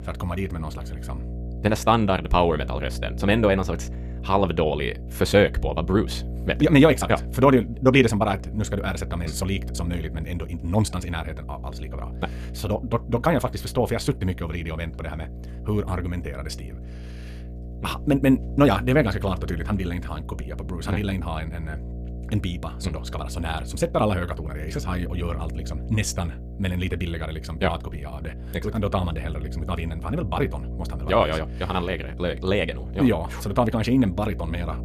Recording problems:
wrong speed, natural pitch; too fast; 1.6 times normal speed
electrical hum; noticeable; throughout; 60 Hz, 20 dB below the speech

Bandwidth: 14 kHz